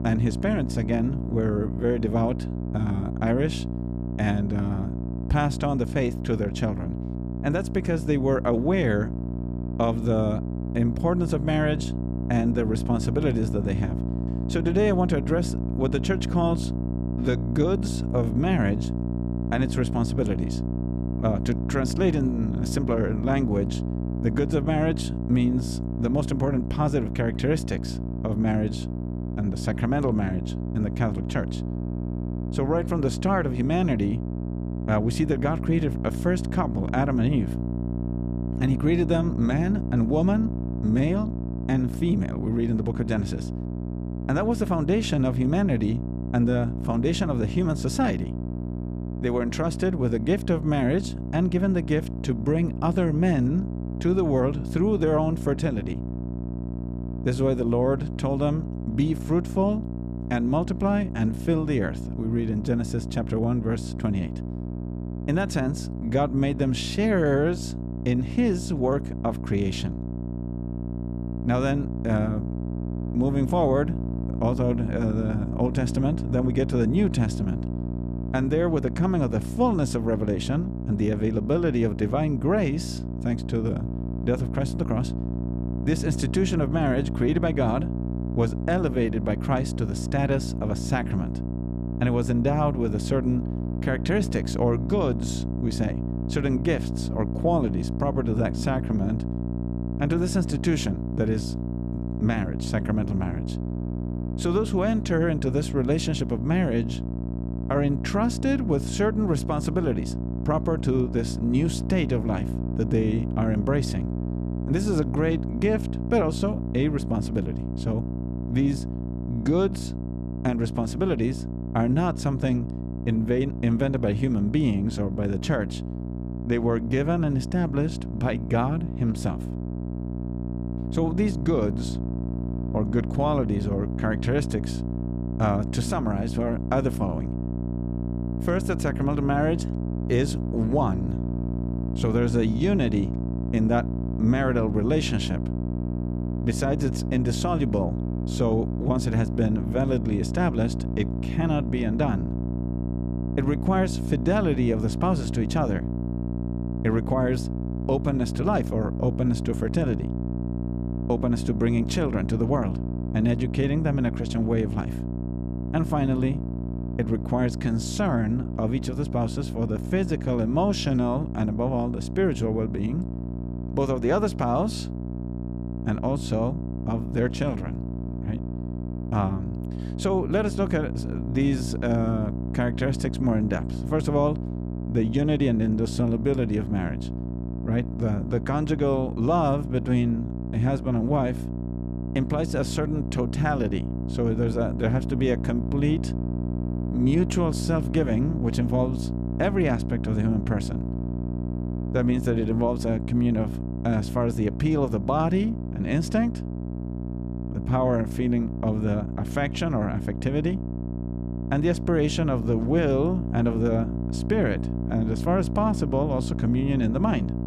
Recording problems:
electrical hum; loud; throughout; 60 Hz, 9 dB below the speech

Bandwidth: 14.5 kHz